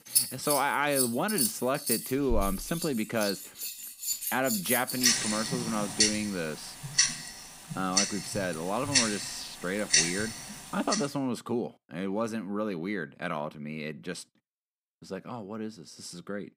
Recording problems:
household noises; very loud; until 11 s; 3 dB above the speech

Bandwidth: 15.5 kHz